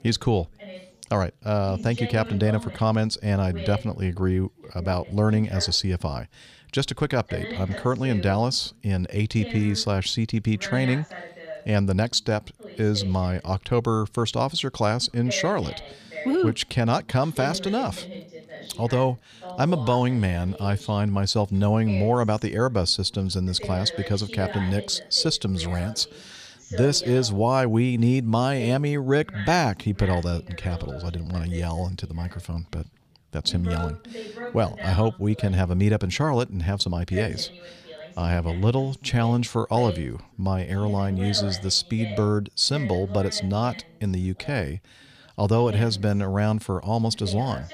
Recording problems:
background chatter; noticeable; throughout; 2 voices, 15 dB below the speech

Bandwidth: 15 kHz